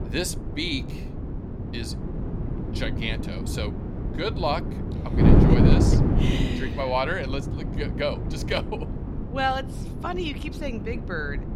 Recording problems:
wind noise on the microphone; heavy; 4 dB below the speech

